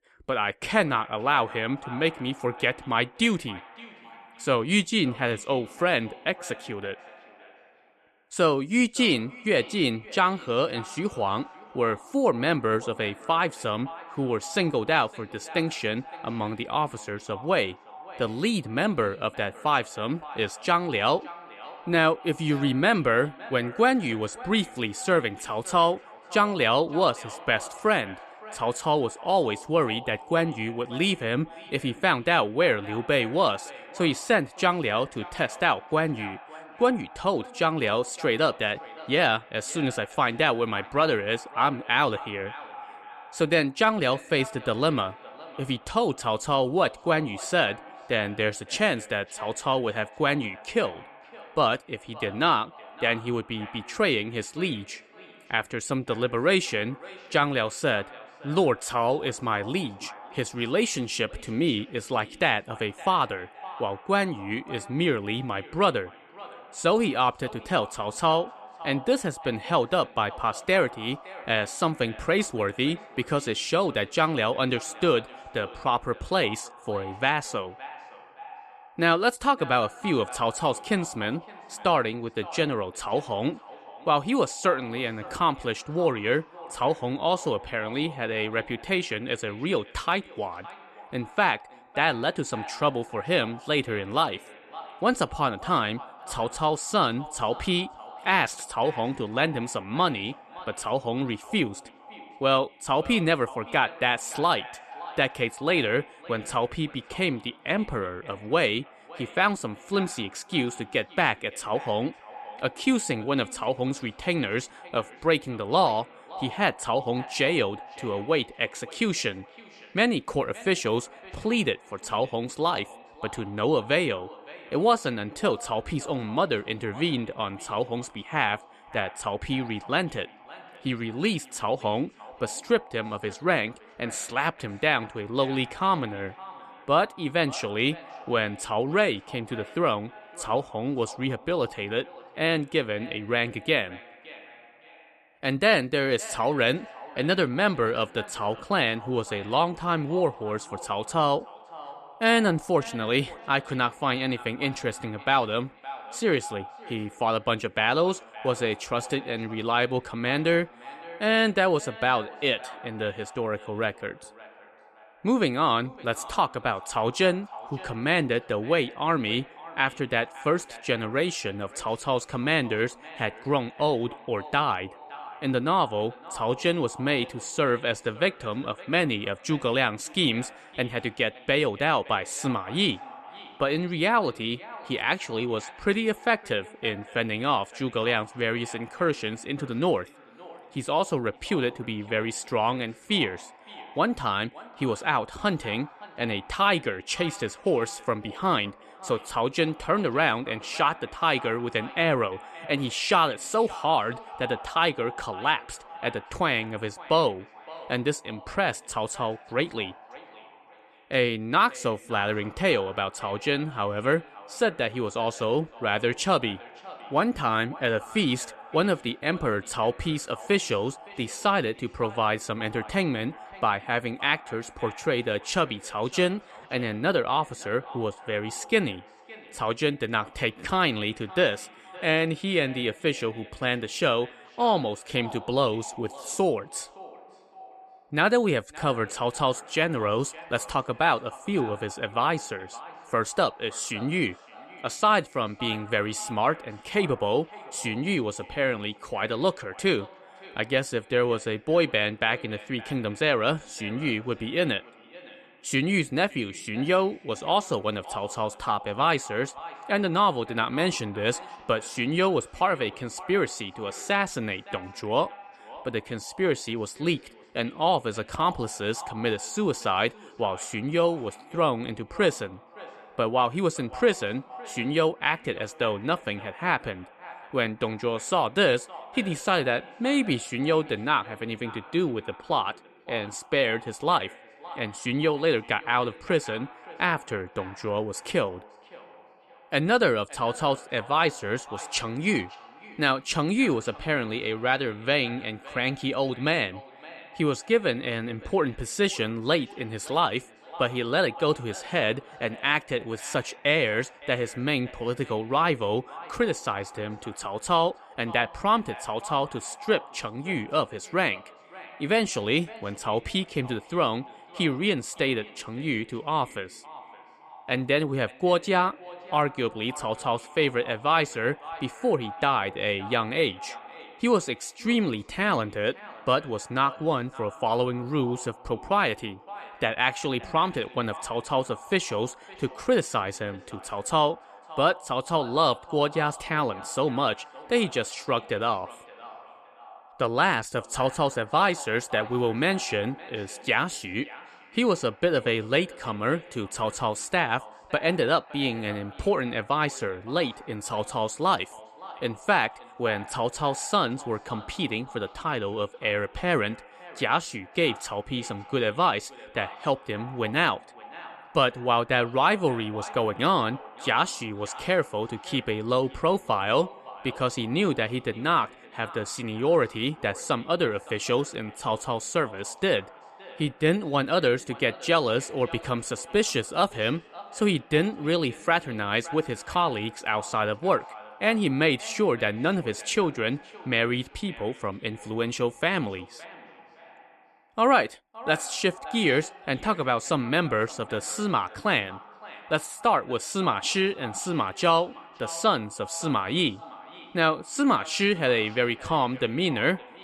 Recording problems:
echo of what is said; faint; throughout; 570 ms later, 20 dB below the speech

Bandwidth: 13.5 kHz